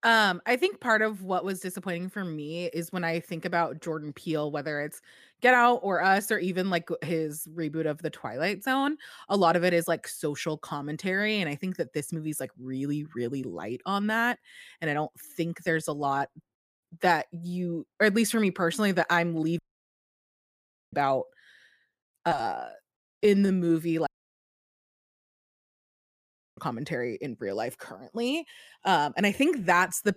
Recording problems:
audio cutting out; at 20 s for 1.5 s and at 24 s for 2.5 s

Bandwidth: 15 kHz